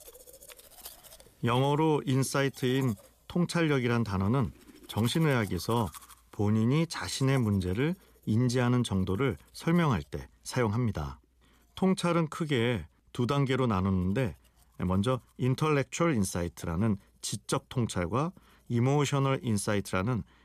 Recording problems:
household noises; faint; throughout; 25 dB below the speech

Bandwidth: 14.5 kHz